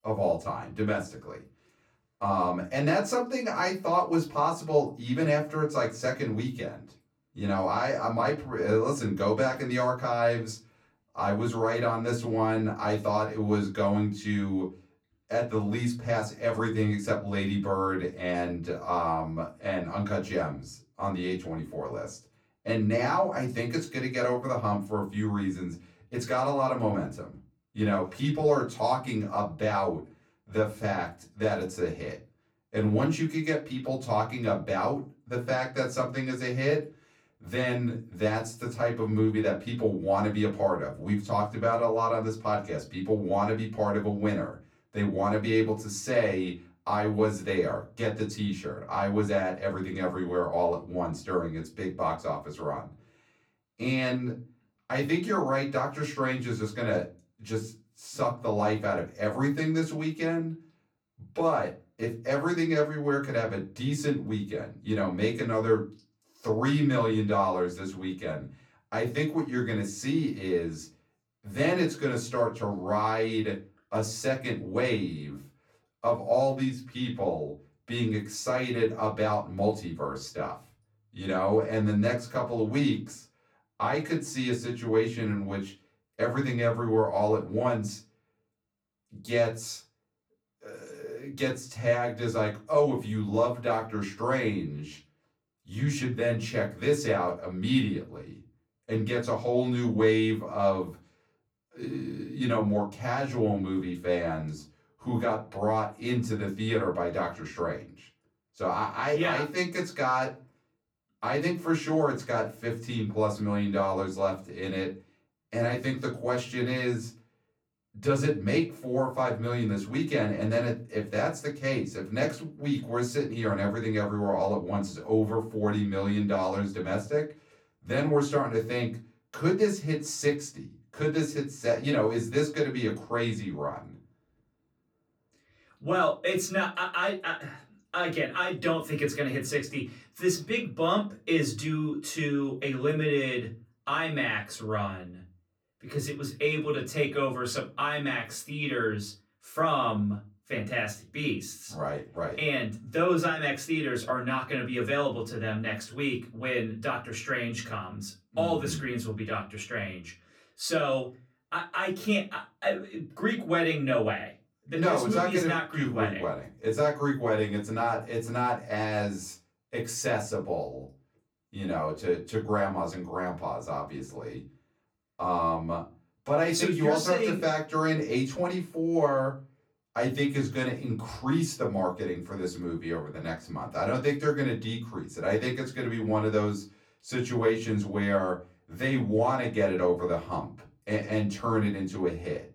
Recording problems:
off-mic speech; far
room echo; very slight; dies away in 0.3 s

